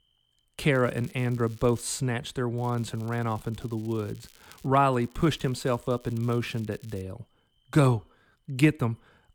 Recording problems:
crackling; faint; from 0.5 to 2 s, from 2.5 to 4.5 s and from 5 to 7 s; 25 dB below the speech

